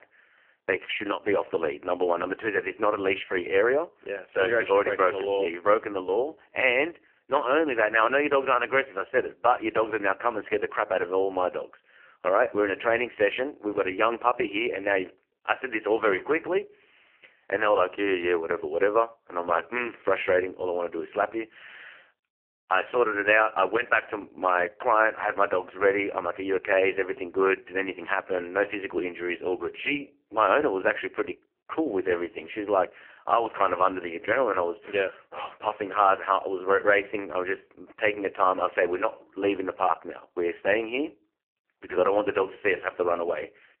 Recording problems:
phone-call audio; poor line; nothing above 3 kHz

